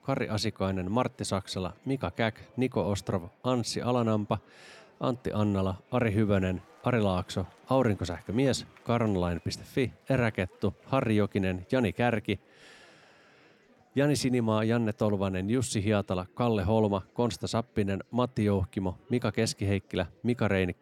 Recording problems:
murmuring crowd; faint; throughout; 30 dB below the speech

